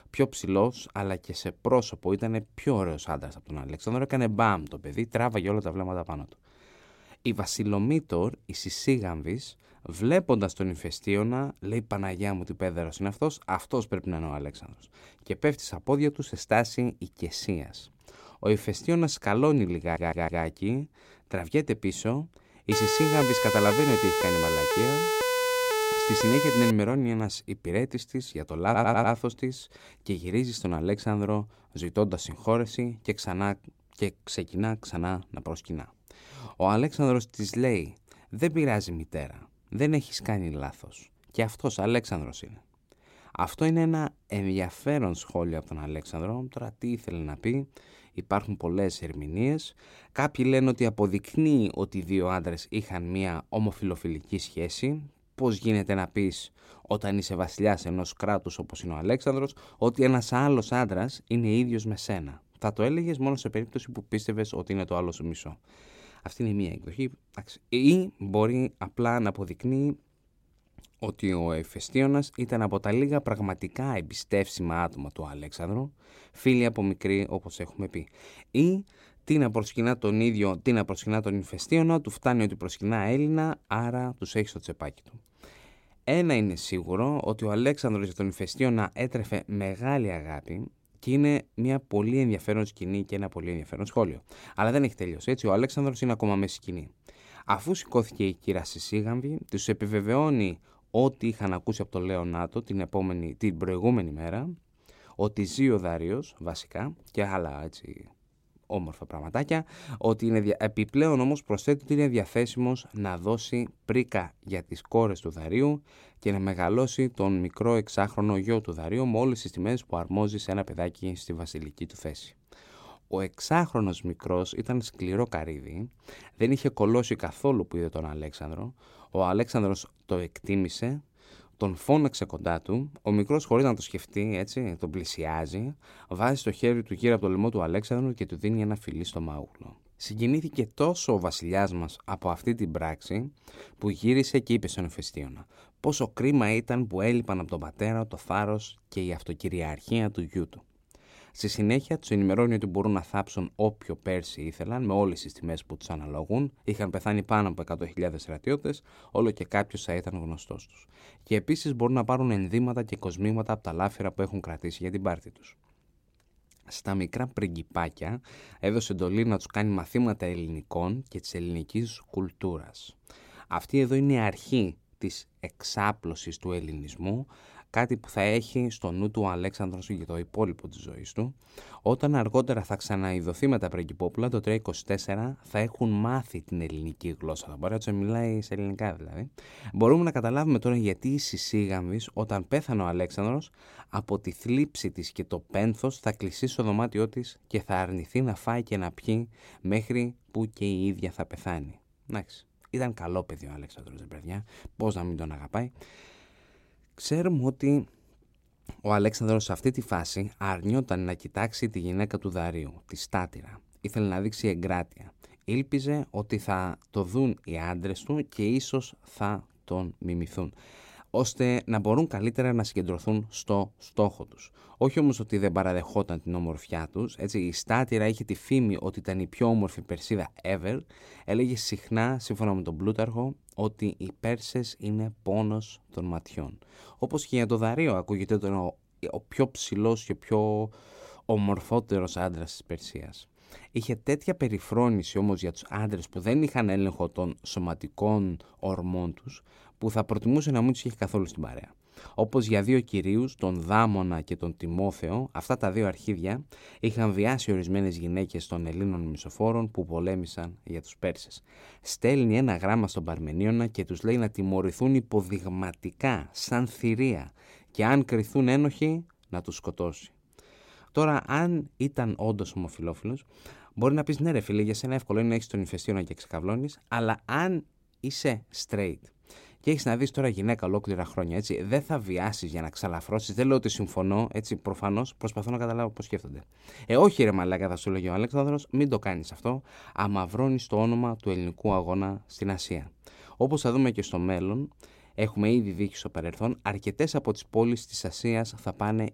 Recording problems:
audio stuttering; at 20 s and at 29 s
siren; loud; from 23 to 27 s; peak 3 dB above the speech

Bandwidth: 16 kHz